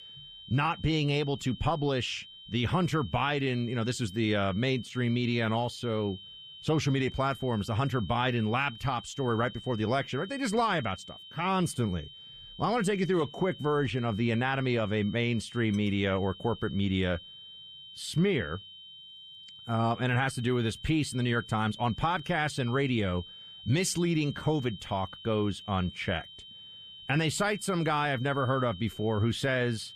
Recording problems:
high-pitched whine; noticeable; throughout; 3 kHz, 15 dB below the speech

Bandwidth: 14.5 kHz